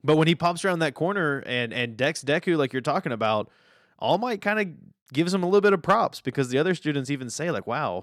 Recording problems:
none

